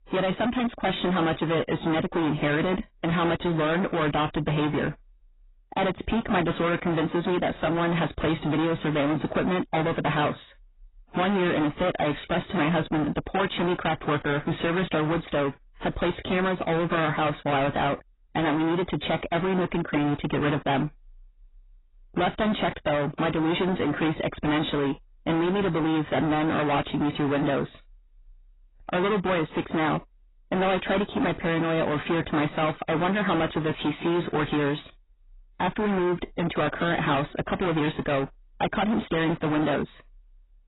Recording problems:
distortion; heavy; 27% of the sound clipped
garbled, watery; badly; nothing above 4 kHz

